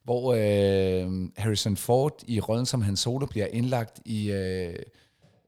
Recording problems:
none

